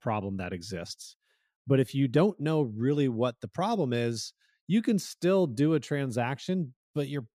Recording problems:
none

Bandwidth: 14.5 kHz